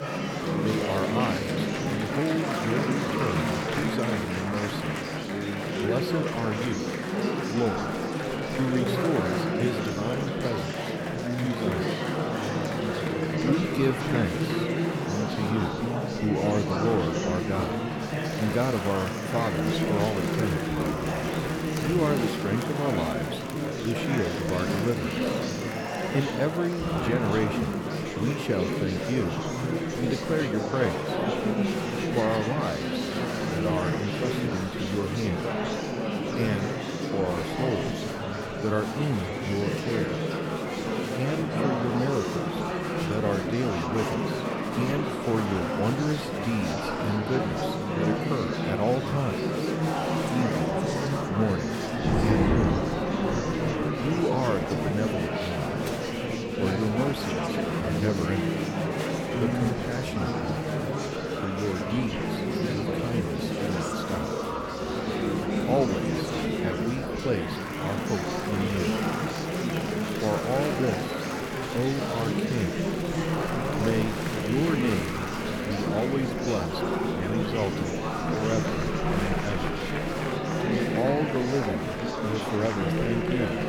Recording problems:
murmuring crowd; very loud; throughout; 2 dB above the speech
rain or running water; loud; throughout; 9 dB below the speech

